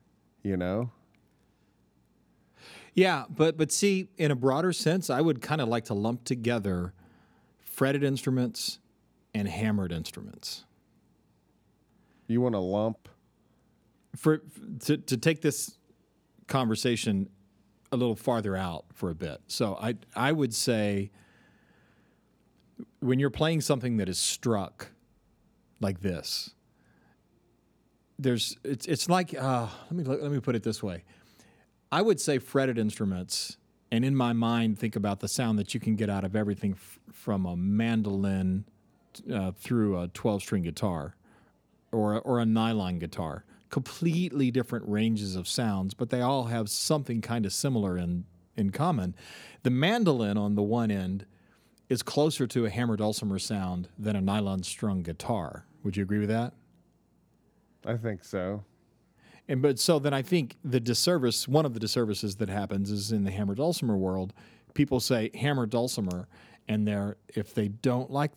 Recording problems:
none

